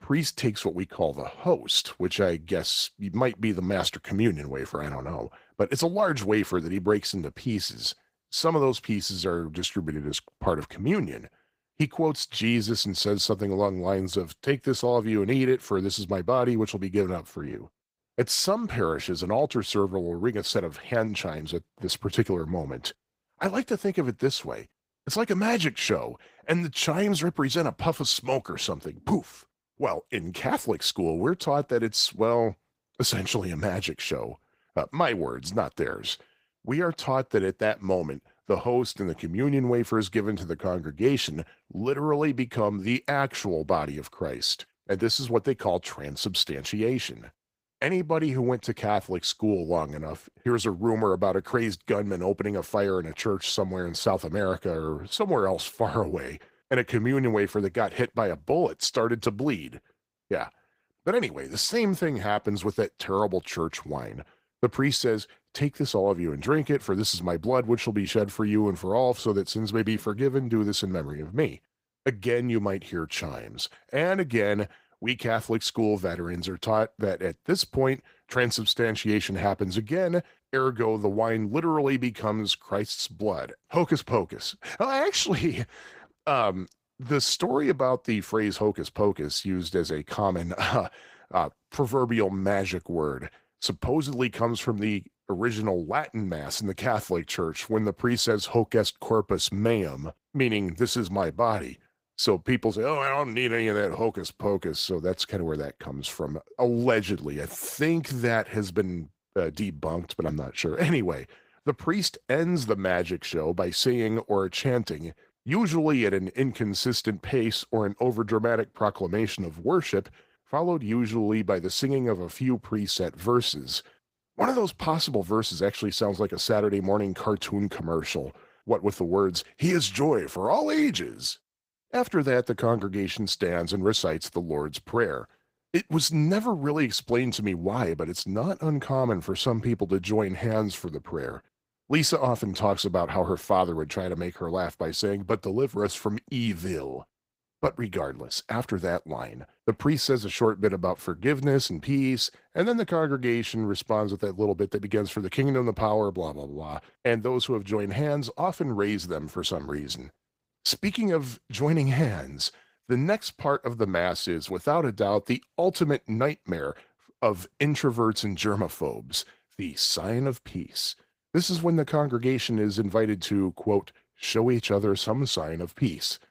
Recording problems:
garbled, watery; slightly; nothing above 15.5 kHz

